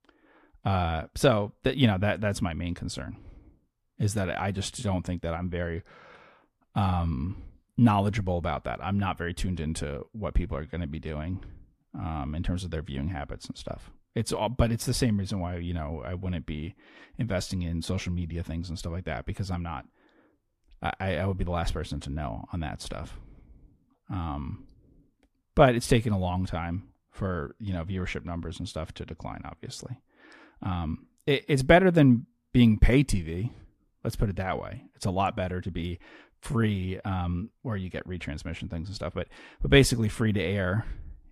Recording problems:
none

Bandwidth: 14.5 kHz